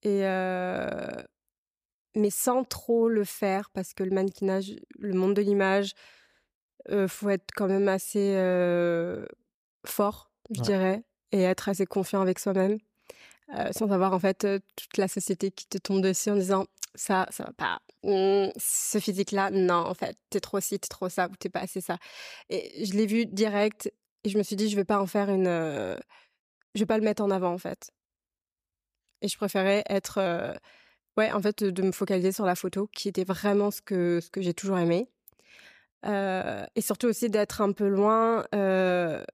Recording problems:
none

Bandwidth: 15 kHz